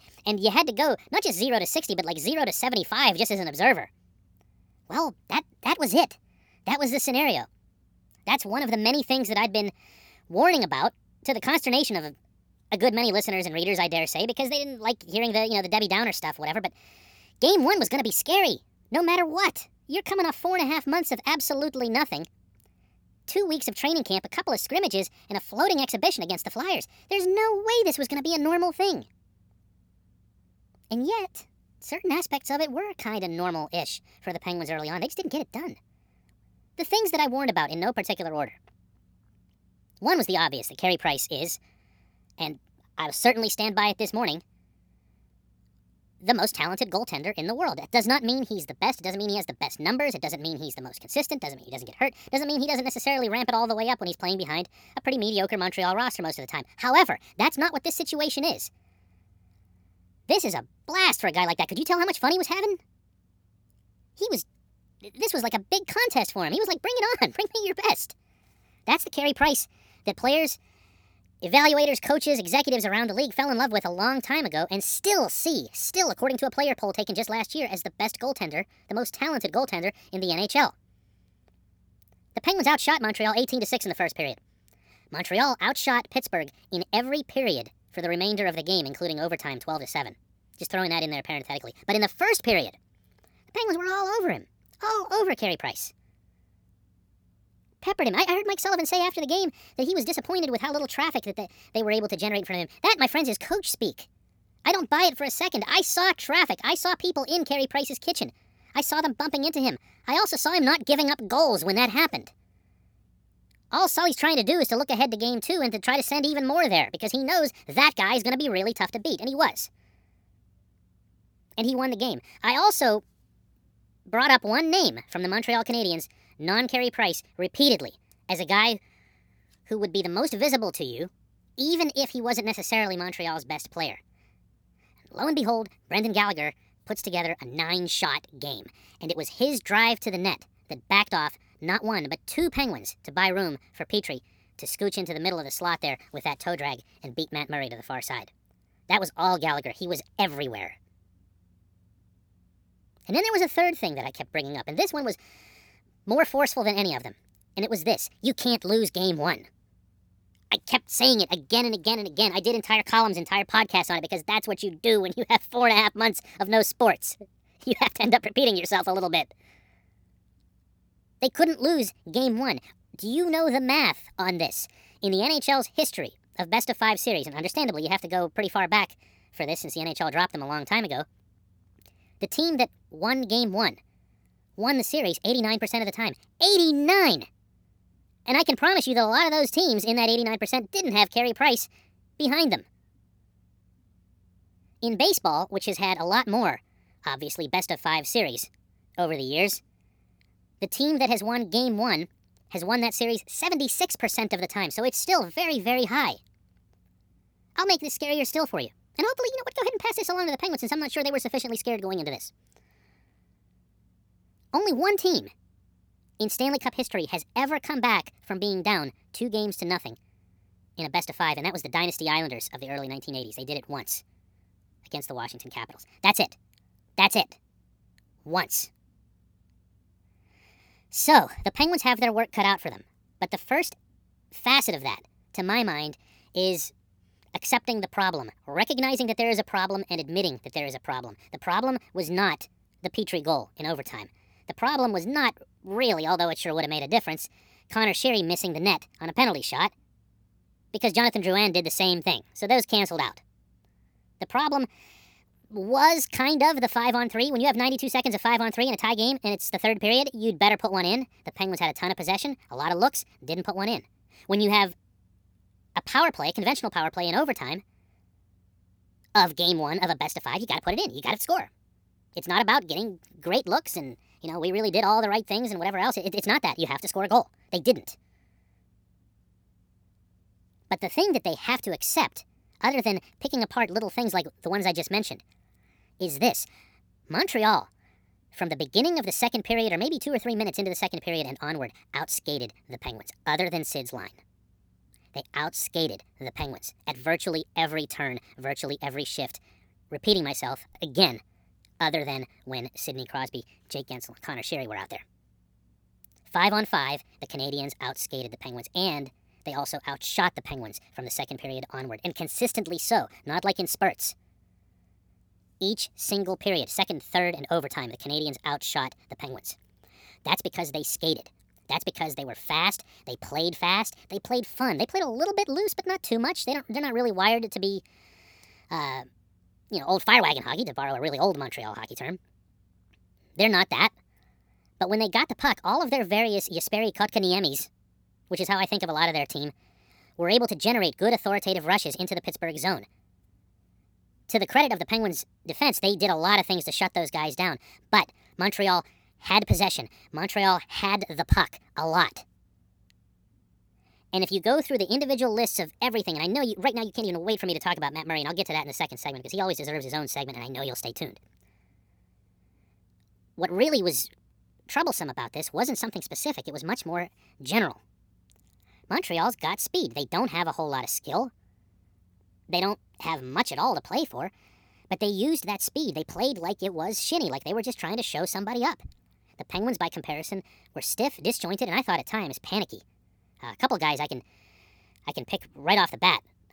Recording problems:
wrong speed and pitch; too fast and too high; 1.5 times normal speed

